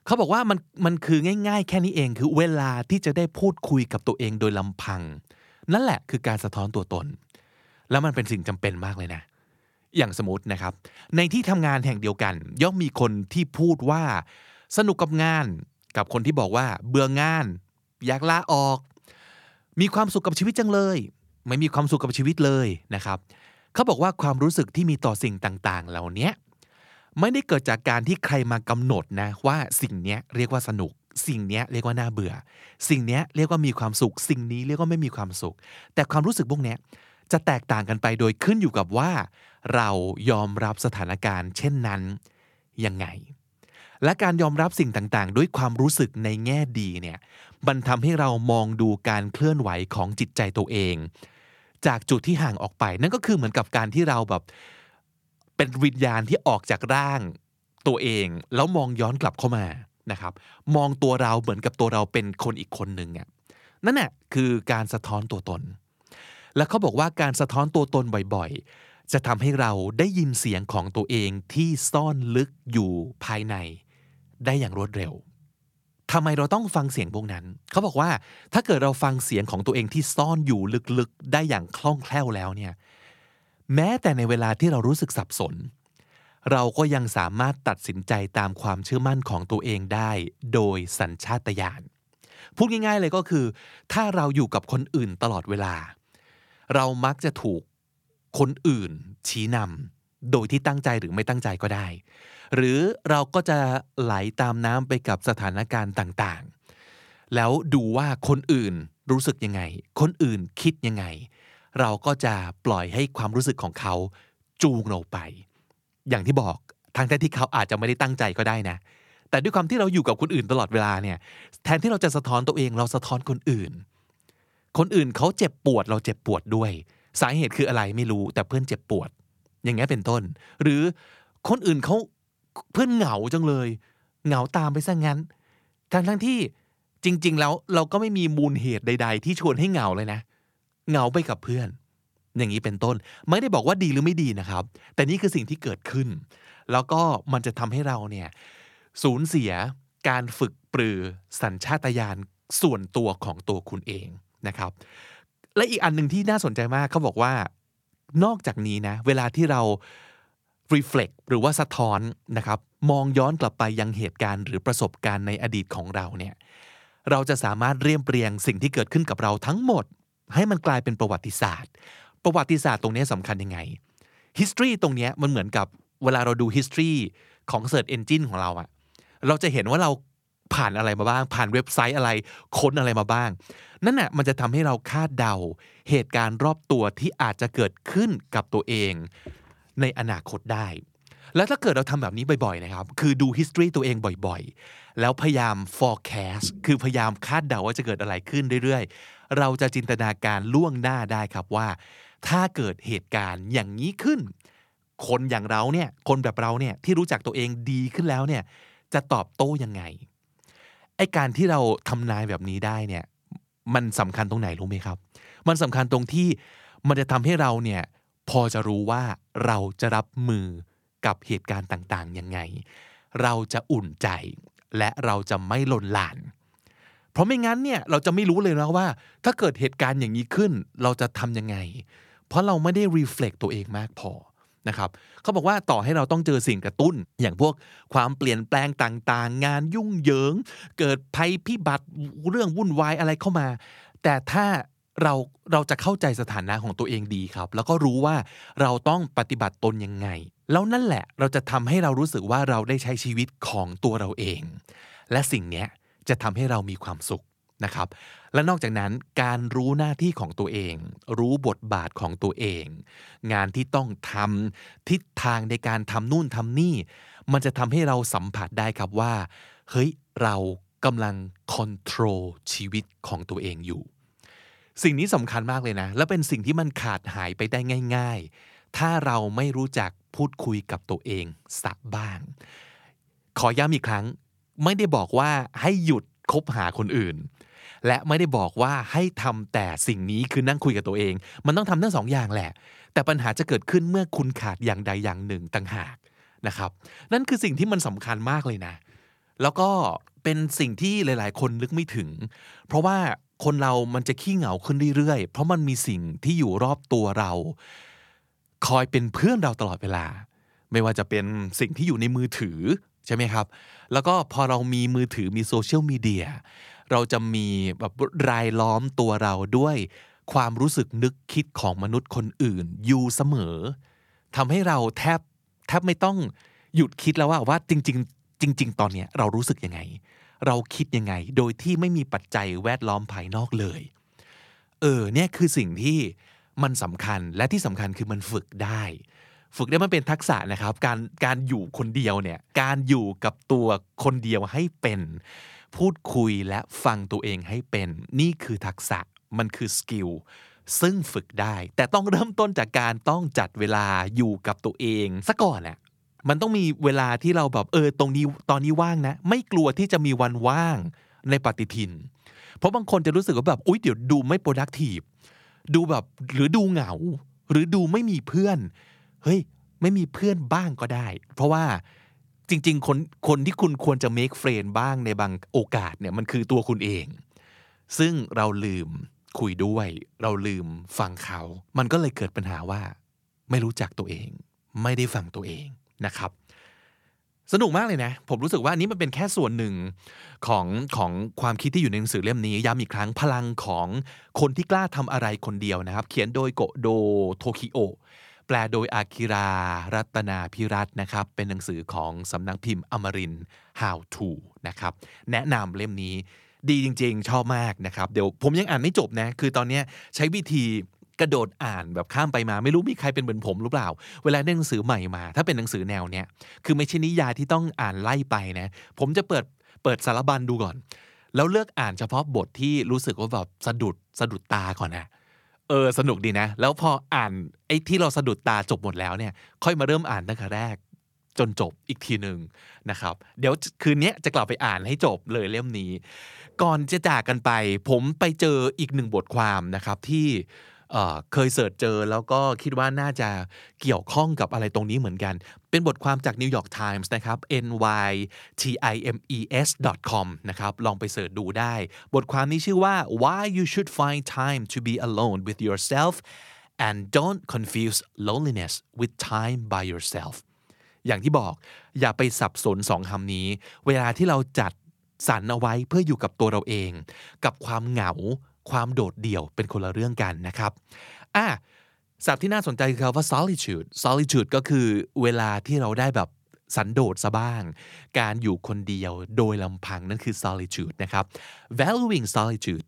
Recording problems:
none

